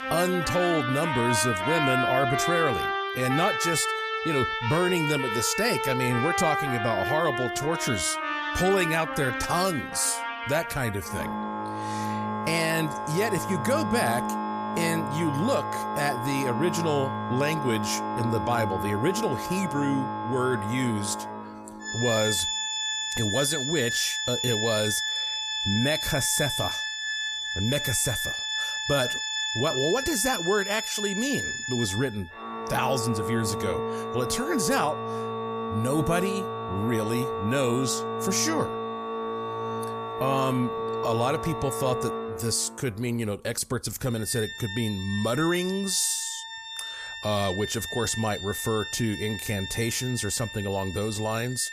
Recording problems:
background music; loud; throughout; 2 dB below the speech

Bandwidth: 14.5 kHz